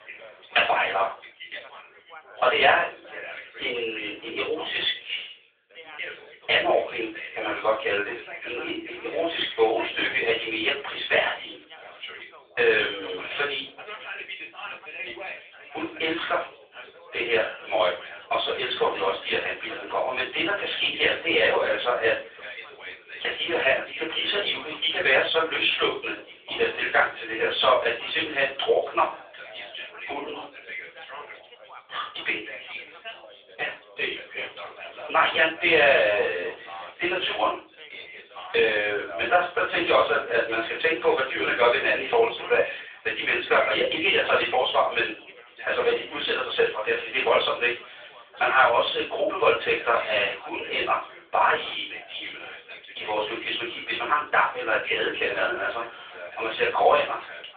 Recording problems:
off-mic speech; far
thin; very; fading below 450 Hz
room echo; slight; dies away in 0.3 s
phone-call audio
background chatter; noticeable; throughout; 4 voices, 15 dB below the speech

